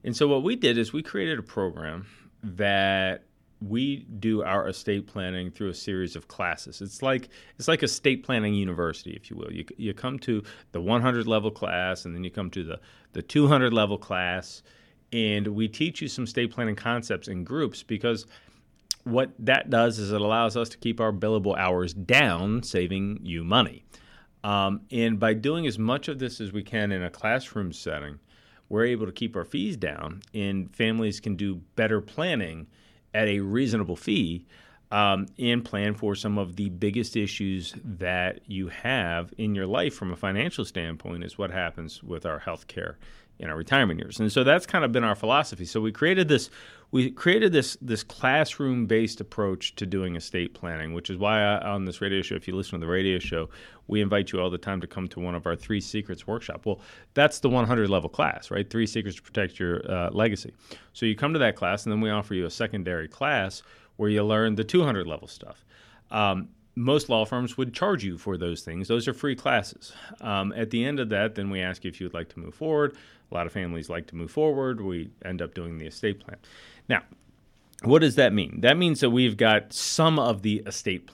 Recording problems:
none

